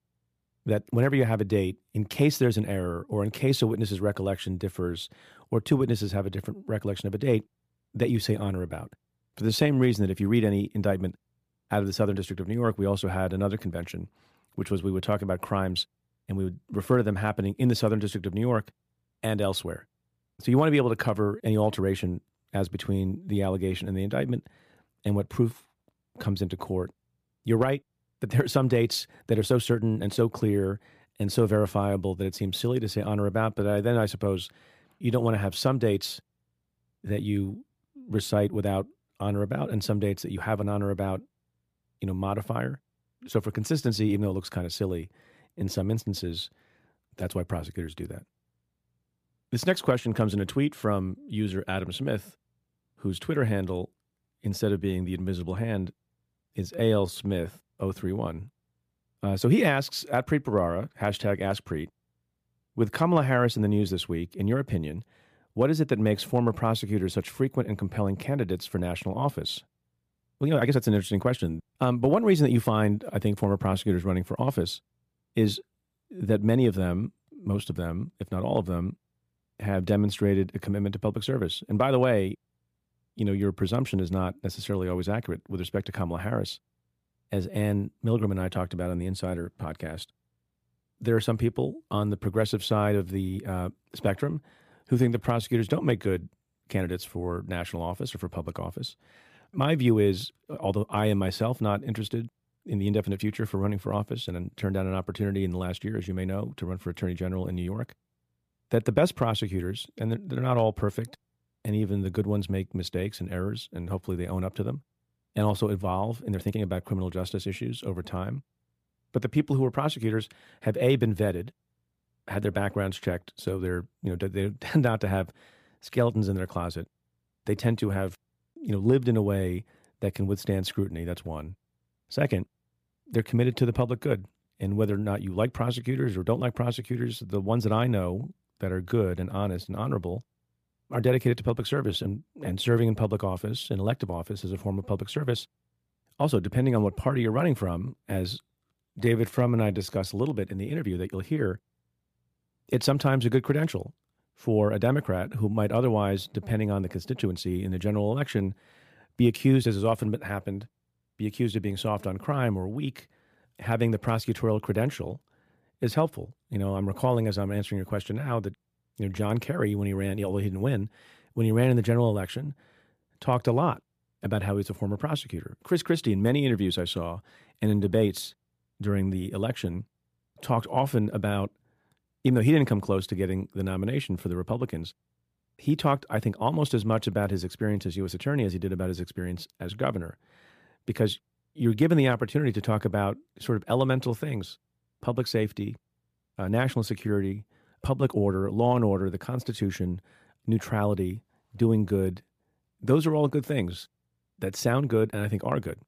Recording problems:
uneven, jittery; strongly; from 9 s to 3:10

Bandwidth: 15 kHz